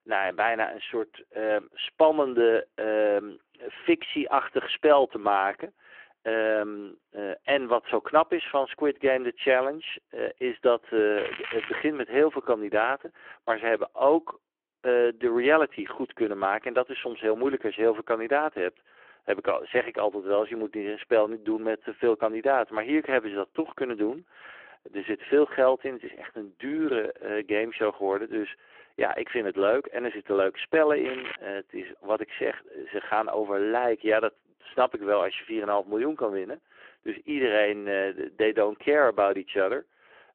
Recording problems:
phone-call audio
crackling; noticeable; at 11 s and at 31 s; 10 dB below the speech

